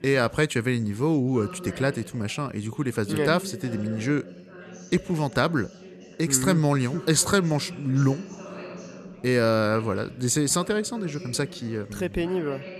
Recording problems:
background chatter; noticeable; throughout; 4 voices, 15 dB below the speech

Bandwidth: 13.5 kHz